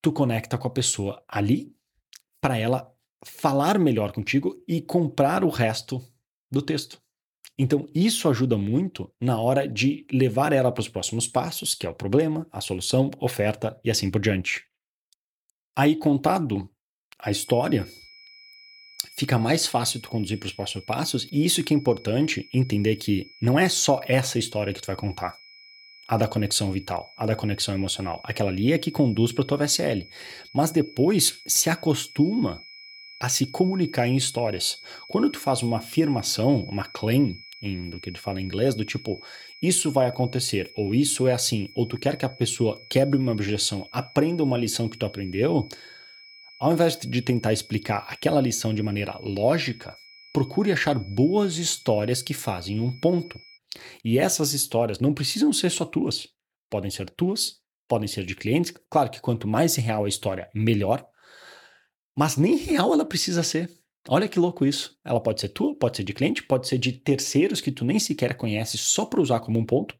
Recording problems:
high-pitched whine; faint; from 17 to 54 s; 5 kHz, 20 dB below the speech

